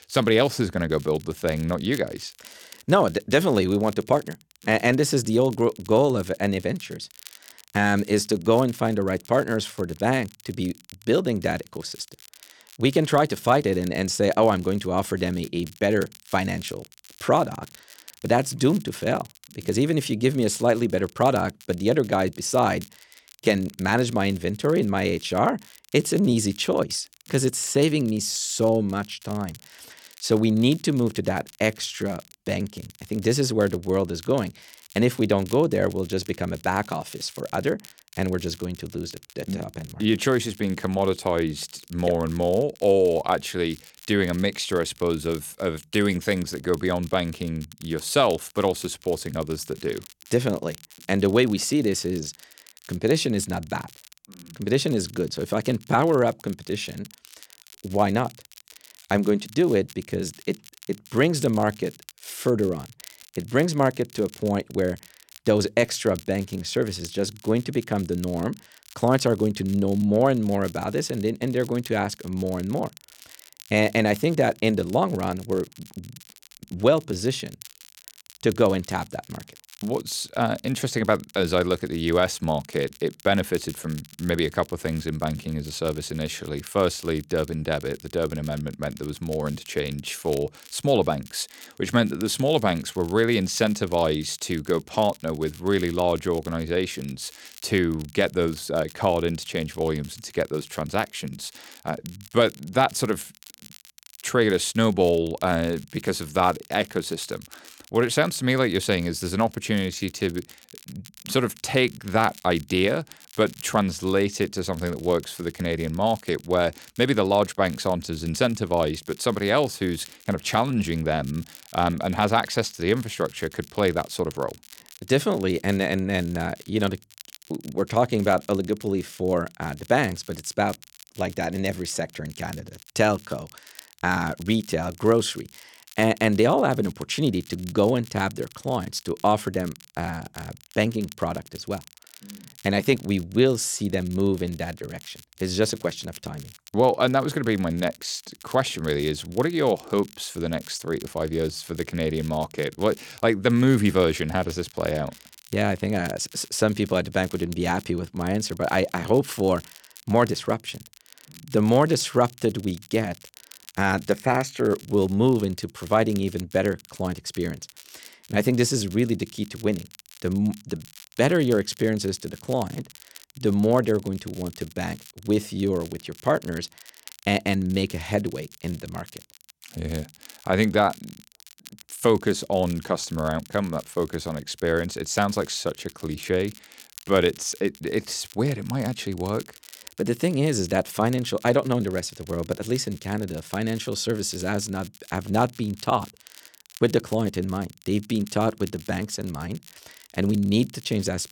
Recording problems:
crackle, like an old record; faint; 20 dB below the speech

